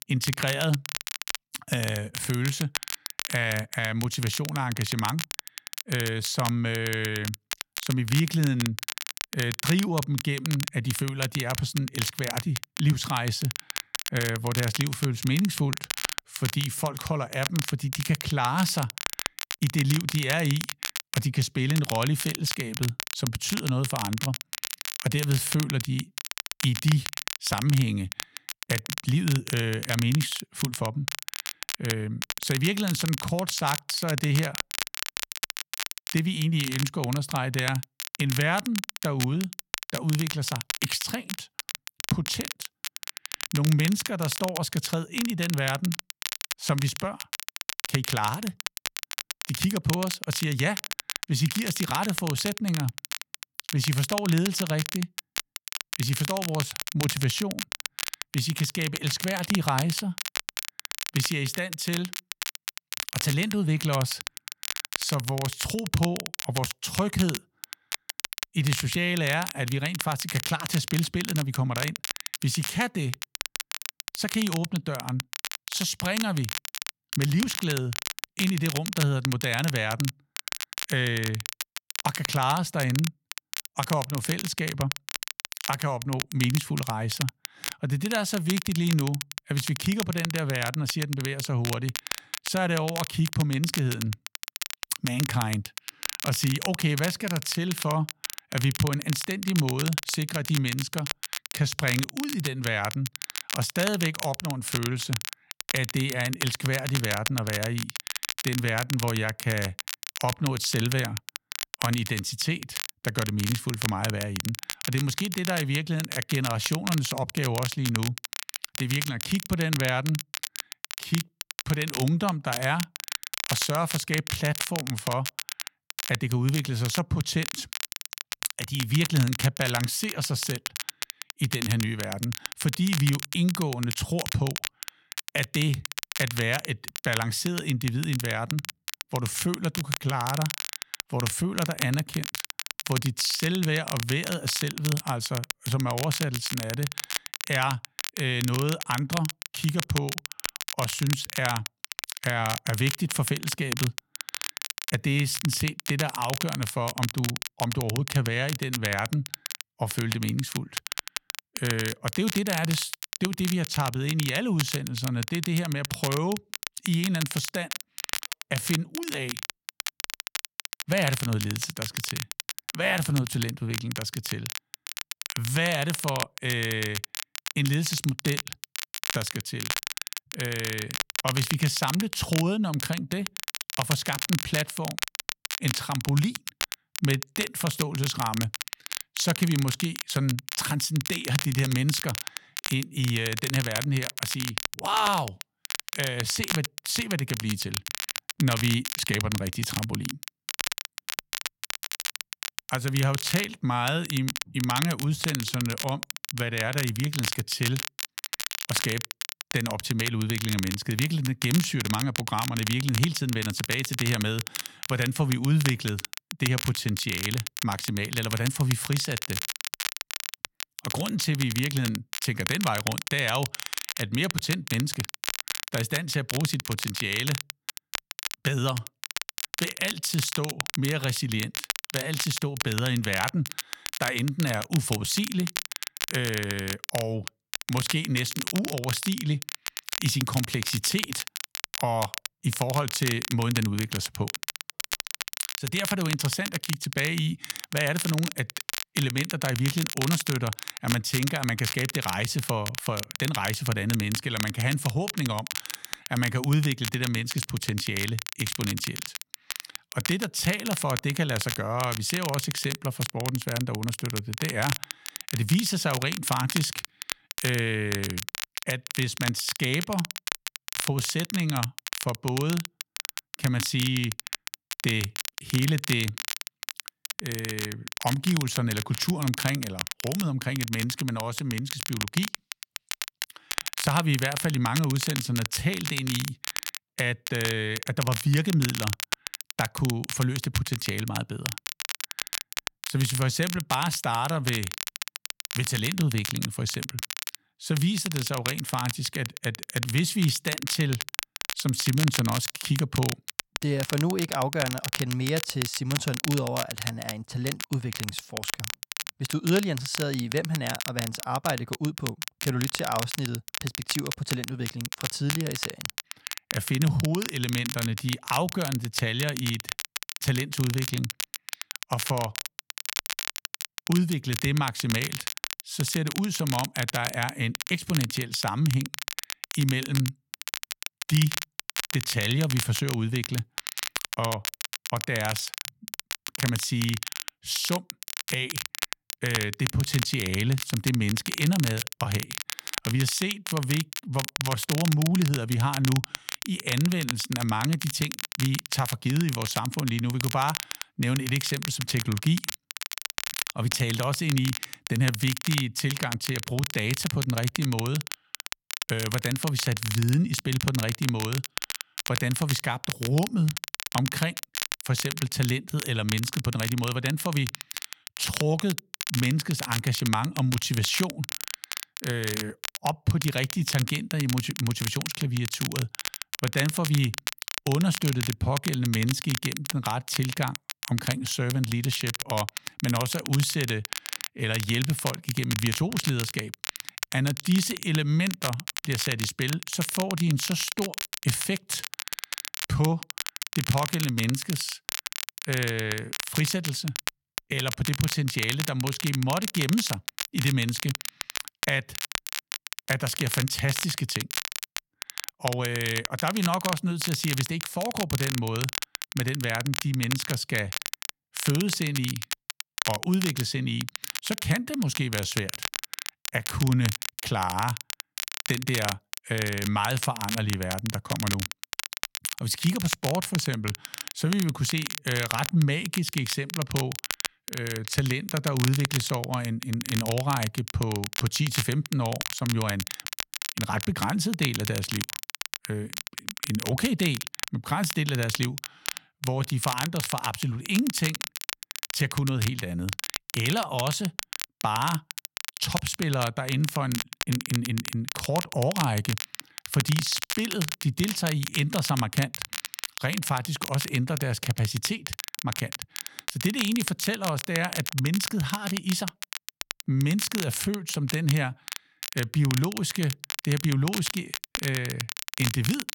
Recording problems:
crackle, like an old record; loud; 5 dB below the speech

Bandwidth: 17 kHz